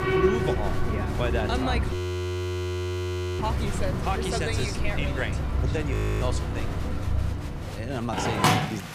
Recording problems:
alarms or sirens; very loud; throughout; 4 dB above the speech
crowd noise; loud; throughout; 9 dB below the speech
hiss; faint; throughout; 25 dB below the speech
animal sounds; very faint; throughout; 25 dB below the speech
audio freezing; at 2 s for 1.5 s and at 6 s

